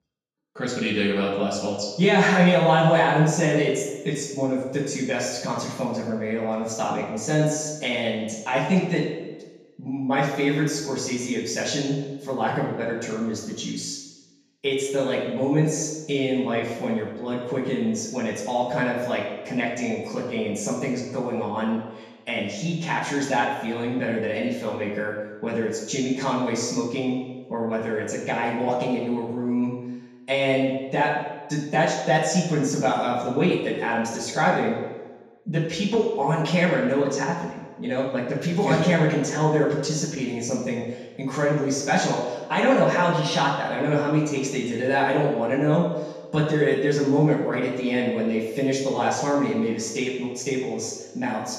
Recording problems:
off-mic speech; far
room echo; noticeable; dies away in 1.1 s

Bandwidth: 14.5 kHz